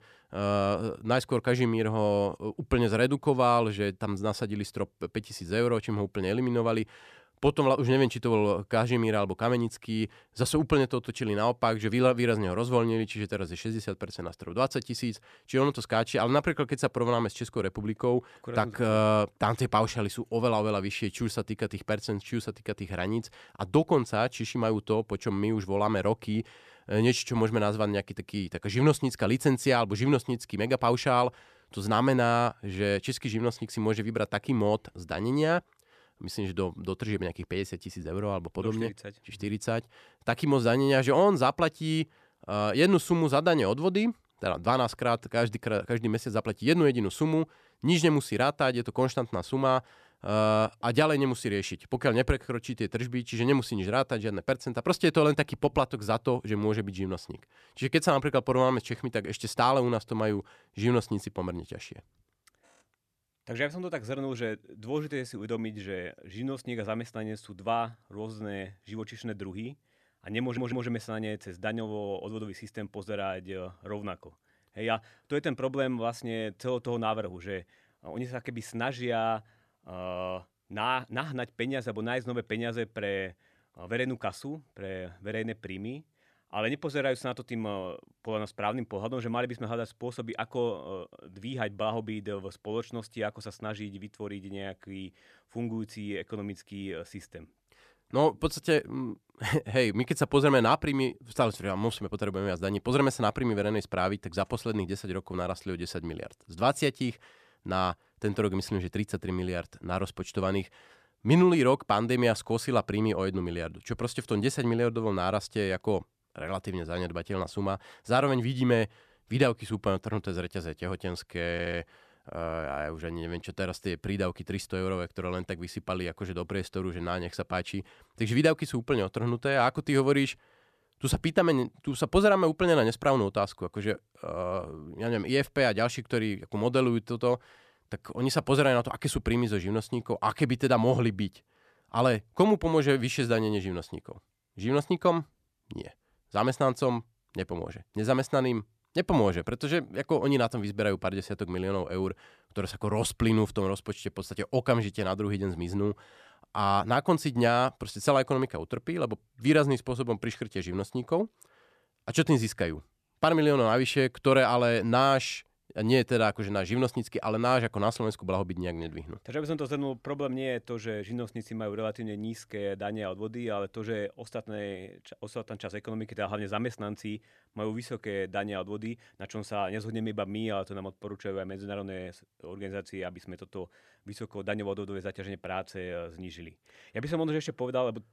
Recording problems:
audio stuttering; at 1:10 and at 2:02

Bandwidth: 14 kHz